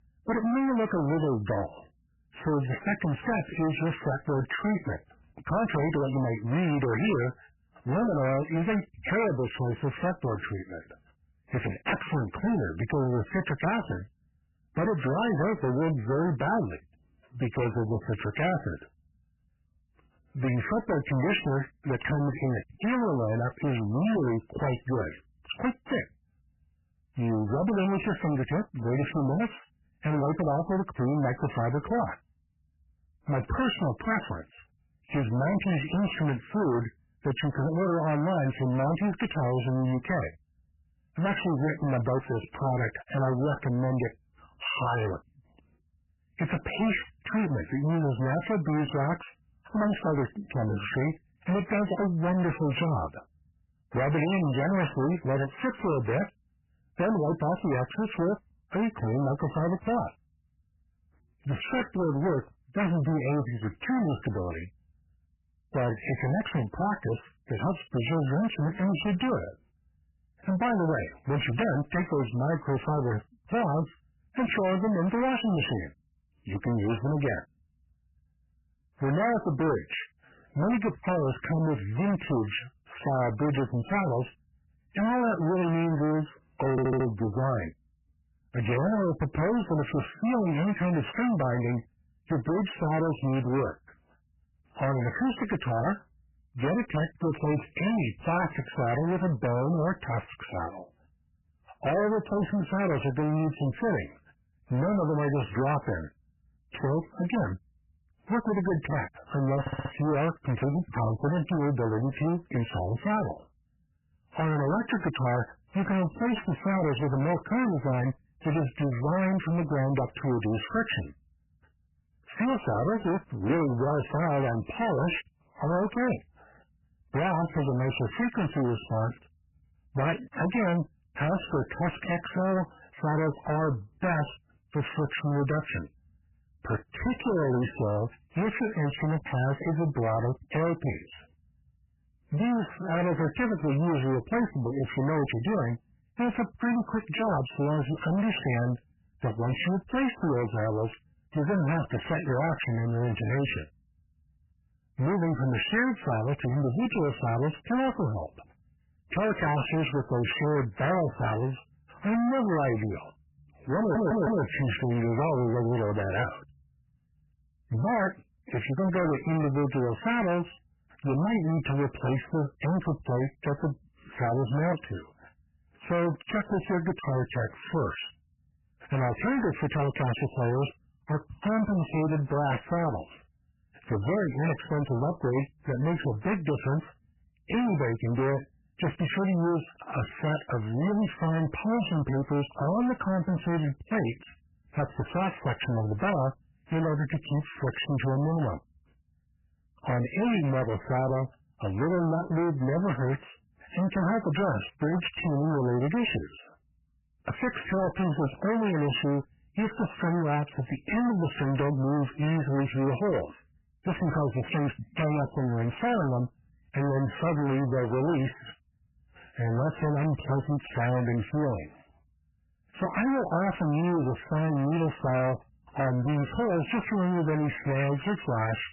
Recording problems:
distortion; heavy; 25% of the sound clipped
garbled, watery; badly; nothing above 3 kHz
audio stuttering; at 1:27, at 1:50 and at 2:44

